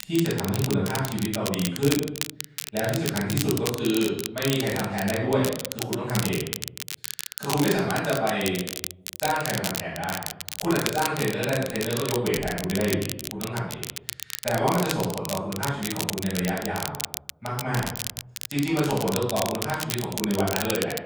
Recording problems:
off-mic speech; far
room echo; noticeable; dies away in 0.7 s
crackle, like an old record; loud; 5 dB below the speech

